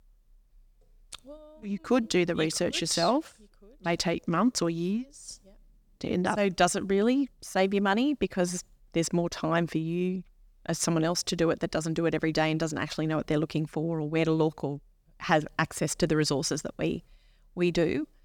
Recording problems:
none

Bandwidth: 19 kHz